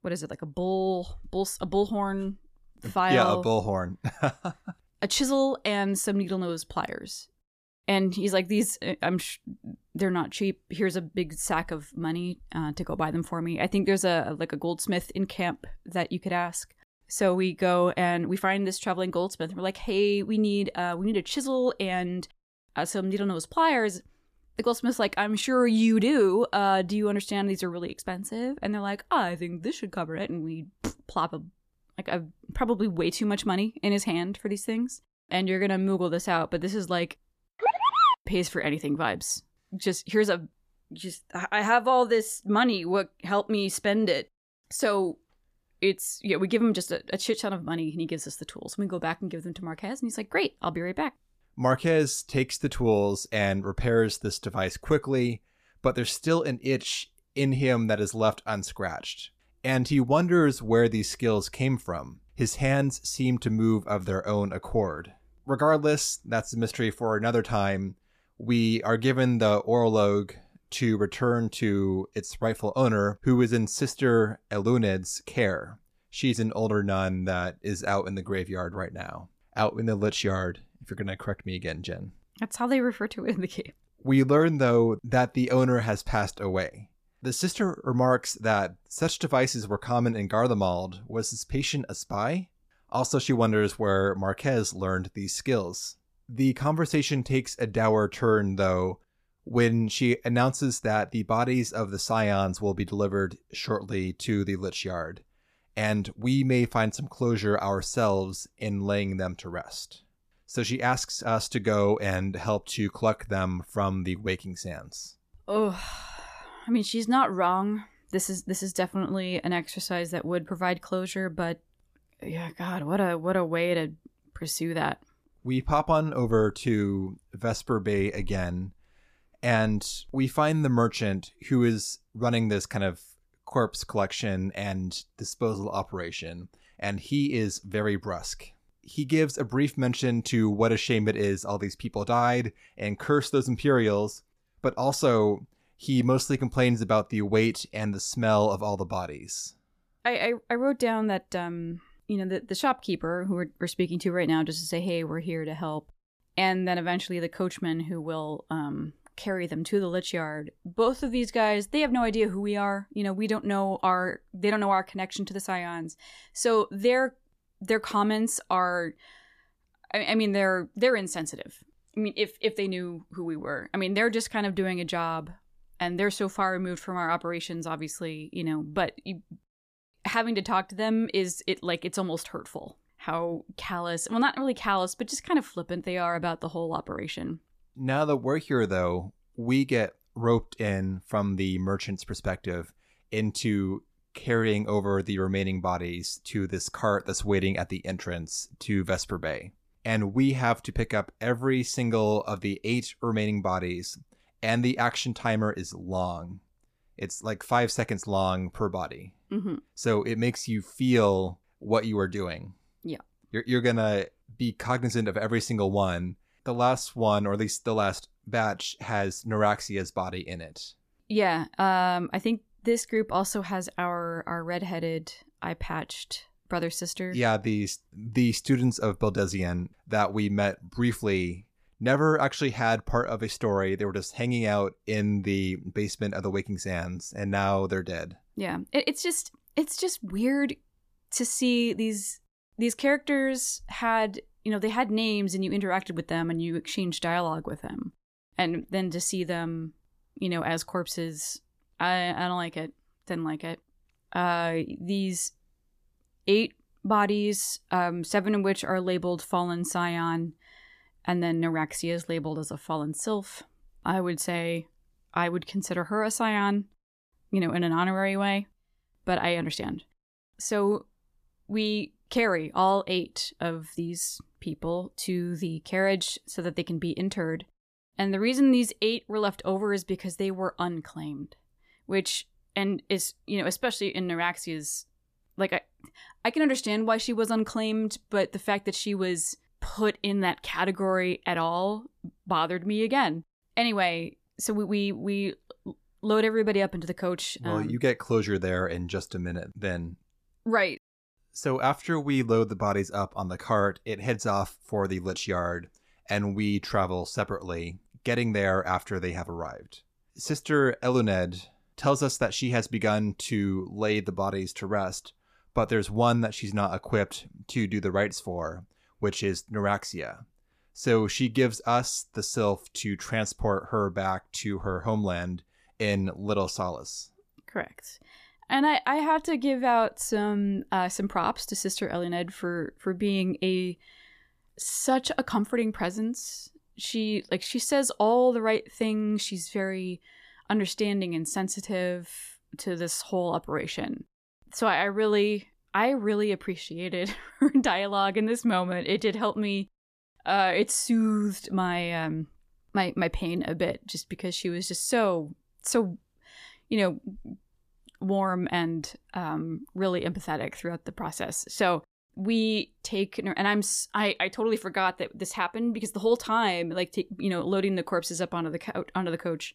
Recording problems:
none

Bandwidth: 14.5 kHz